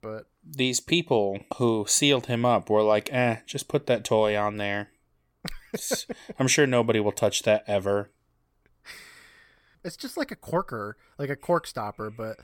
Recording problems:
none

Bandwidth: 17 kHz